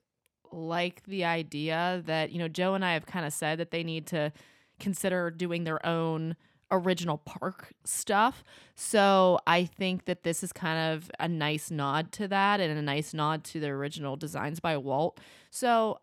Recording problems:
none

